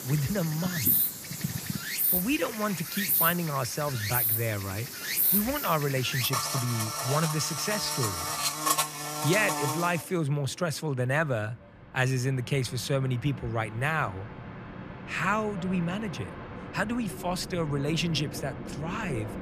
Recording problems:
animal sounds; very loud; until 10 s; 2 dB above the speech
train or aircraft noise; noticeable; throughout; 10 dB below the speech

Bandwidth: 14.5 kHz